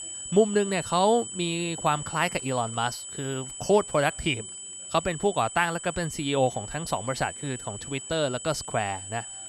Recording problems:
high-pitched whine; loud; throughout; 8 kHz, 9 dB below the speech
chatter from many people; faint; throughout; 30 dB below the speech

